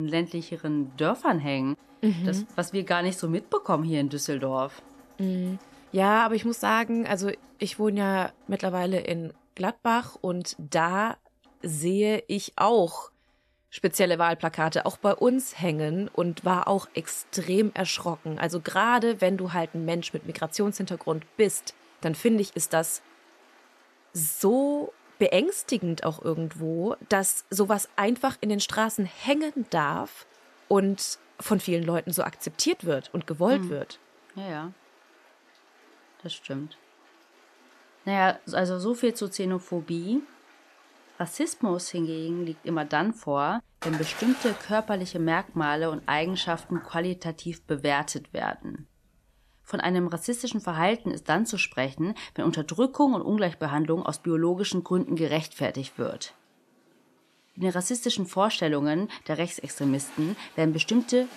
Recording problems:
rain or running water; faint; throughout; 25 dB below the speech
abrupt cut into speech; at the start

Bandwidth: 13.5 kHz